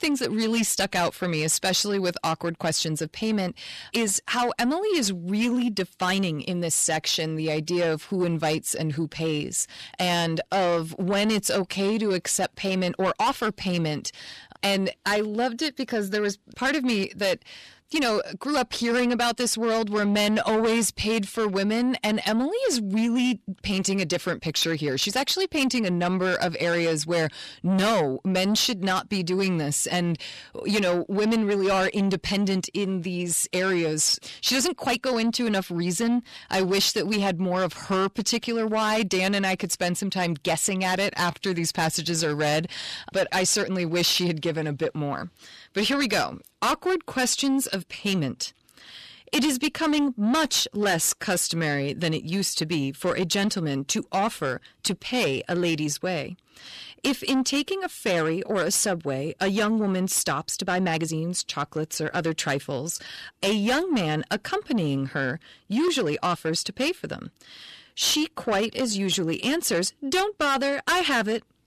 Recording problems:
distortion; heavy; 8 dB below the speech
uneven, jittery; strongly; from 6 s to 1:09

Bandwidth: 14 kHz